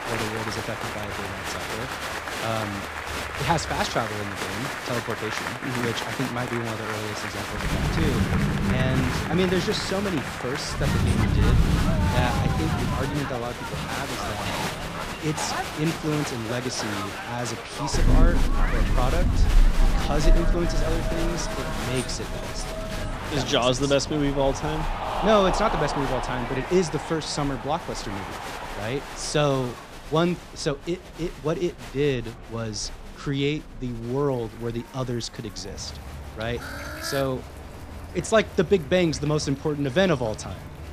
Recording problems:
crowd noise; loud; throughout; 4 dB below the speech
rain or running water; loud; throughout; 3 dB below the speech
animal sounds; faint; throughout; 20 dB below the speech

